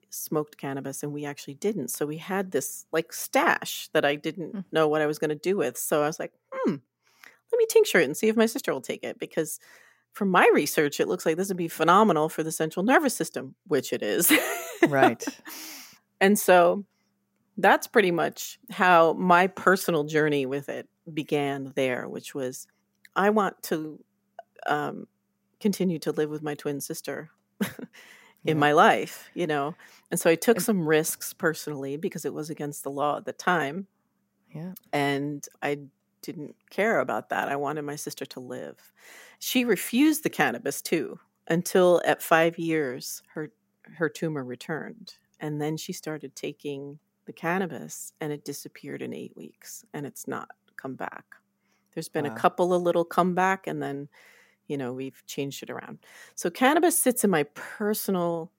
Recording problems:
none

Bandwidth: 16 kHz